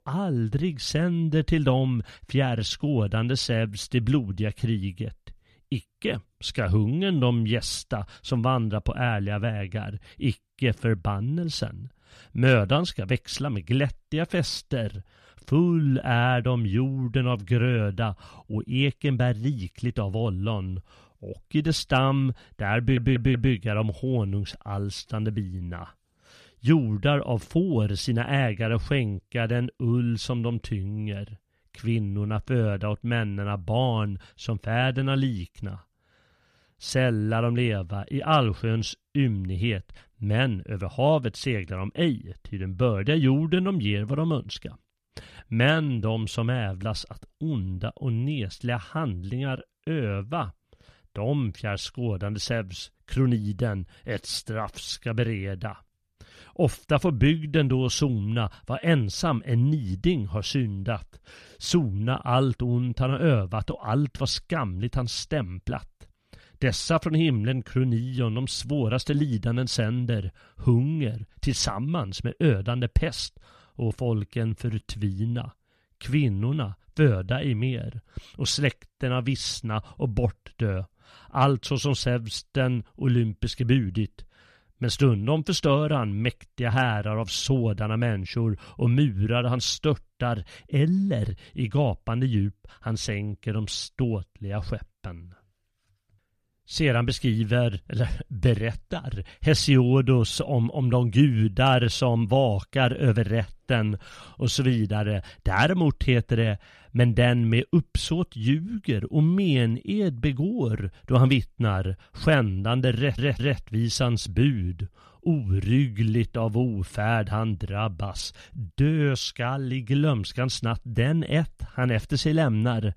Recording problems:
audio stuttering; at 23 s and at 1:53

